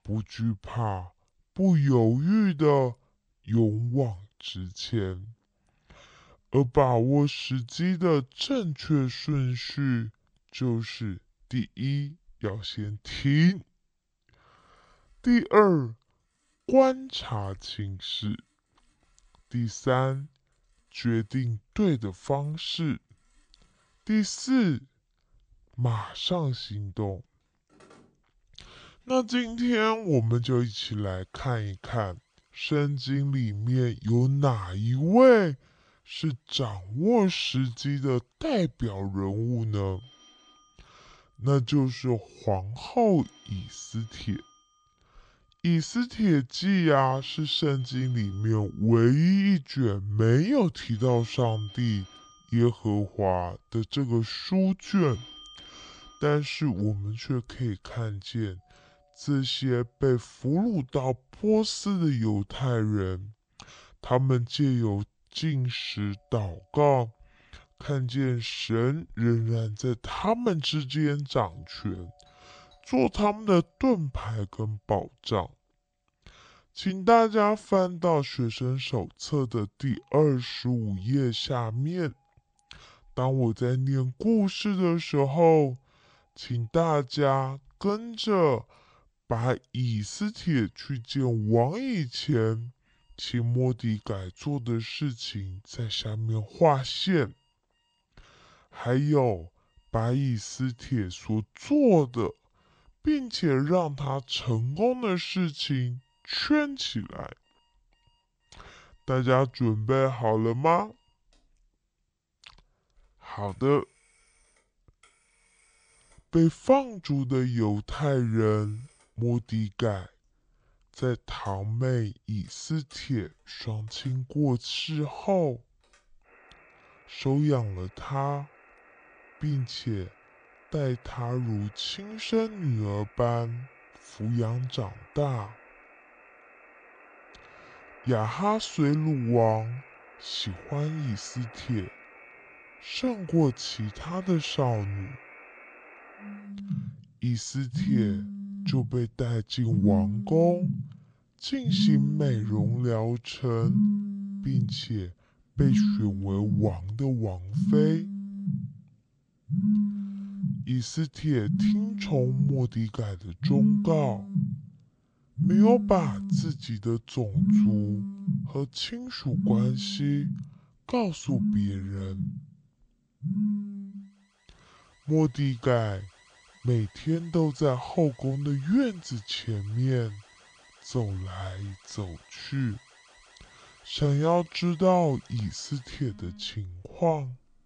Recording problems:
wrong speed and pitch; too slow and too low; 0.6 times normal speed
alarms or sirens; loud; throughout; 3 dB below the speech

